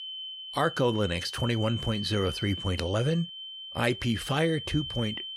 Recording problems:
high-pitched whine; loud; throughout; 3 kHz, 8 dB below the speech

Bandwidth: 16.5 kHz